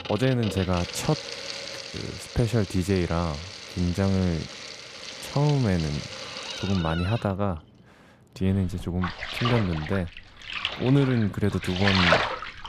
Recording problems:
household noises; loud; throughout; 5 dB below the speech

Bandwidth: 14.5 kHz